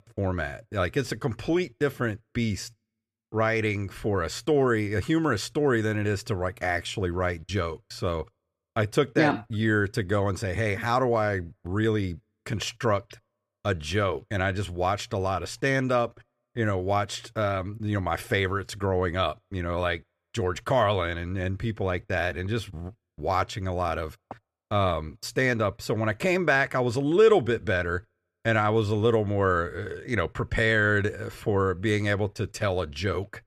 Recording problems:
none

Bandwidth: 14 kHz